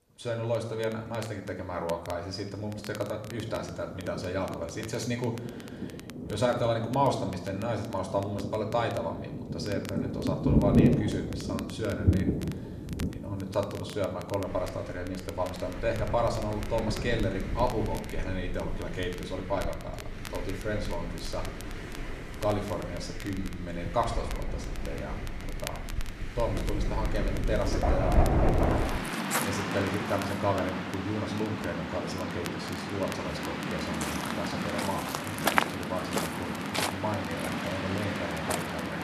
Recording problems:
room echo; slight; dies away in 0.8 s
off-mic speech; somewhat distant
rain or running water; very loud; throughout; as loud as the speech
crackle, like an old record; noticeable; 15 dB below the speech

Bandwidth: 13.5 kHz